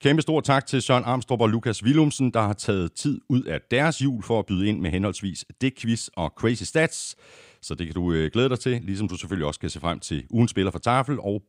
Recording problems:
none

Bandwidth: 15.5 kHz